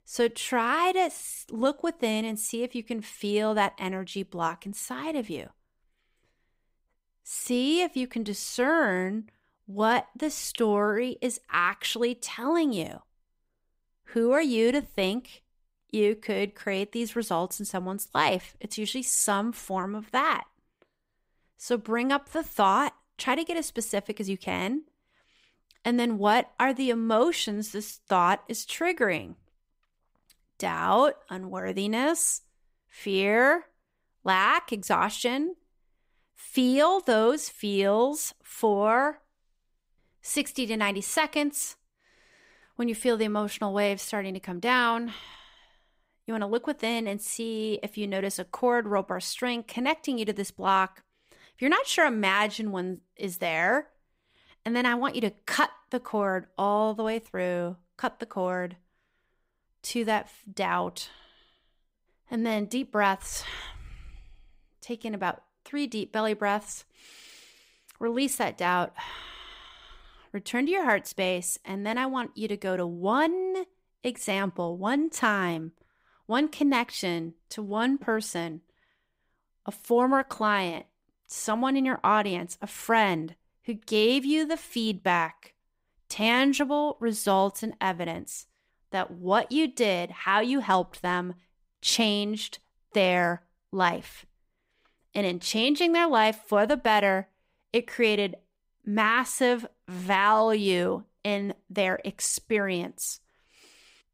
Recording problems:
none

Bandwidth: 15.5 kHz